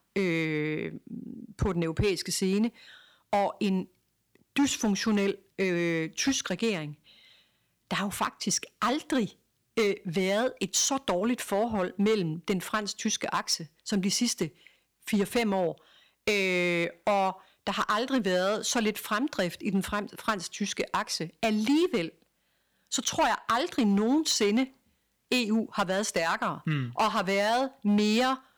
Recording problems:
distortion; slight; 4% of the sound clipped

